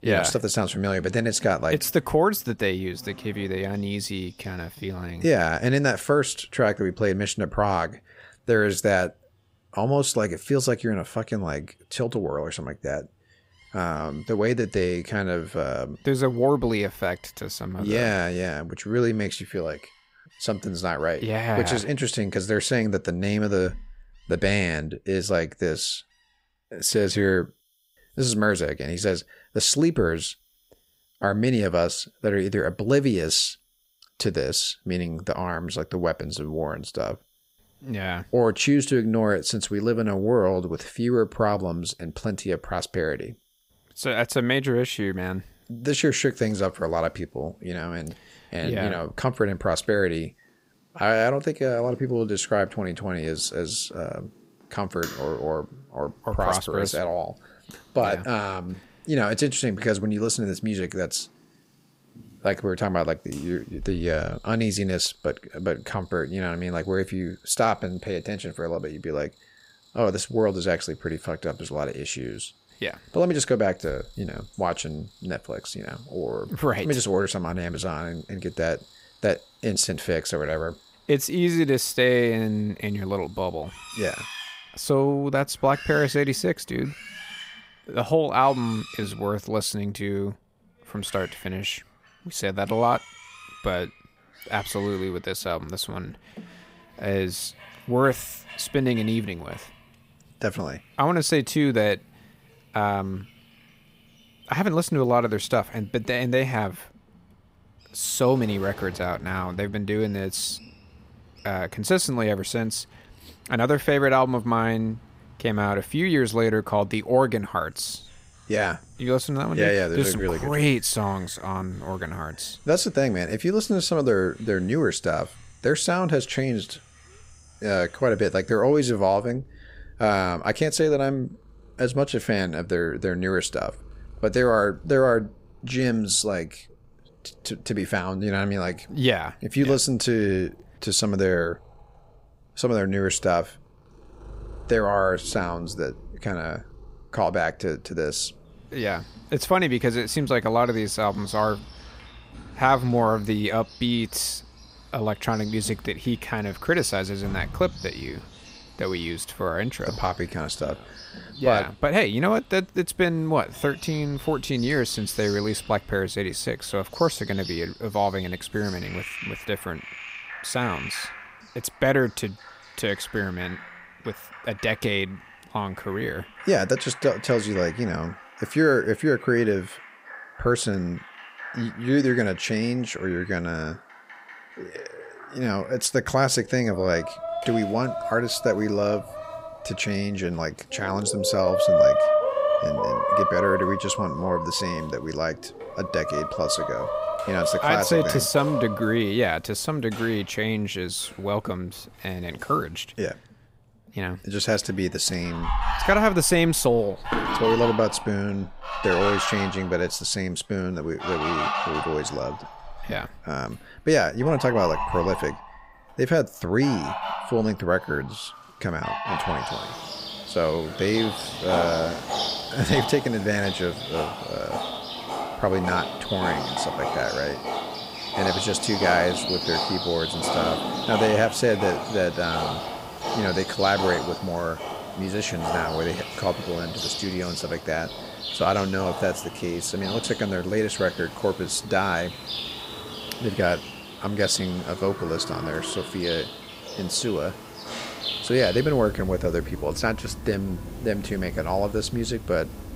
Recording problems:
animal sounds; loud; throughout; 6 dB below the speech

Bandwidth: 15.5 kHz